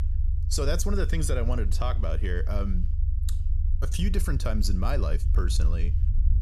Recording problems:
low rumble; noticeable; throughout; 15 dB below the speech

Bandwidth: 14.5 kHz